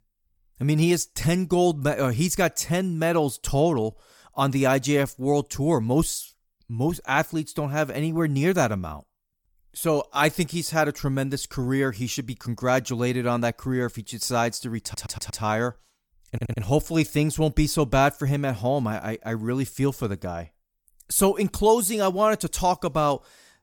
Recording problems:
audio stuttering; at 15 s and at 16 s

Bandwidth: 18 kHz